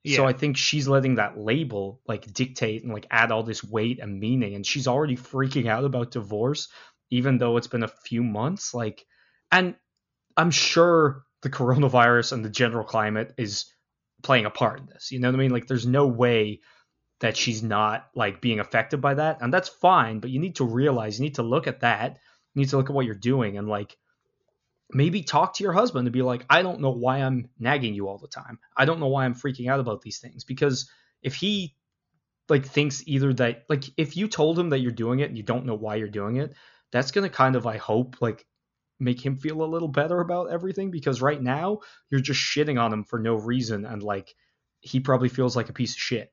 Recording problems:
high frequencies cut off; noticeable; nothing above 7 kHz

